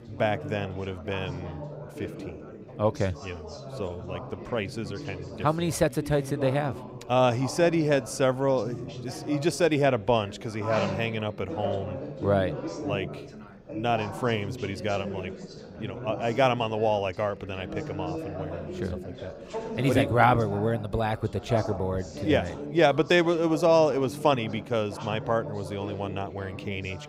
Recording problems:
background chatter; noticeable; throughout; 4 voices, 10 dB below the speech

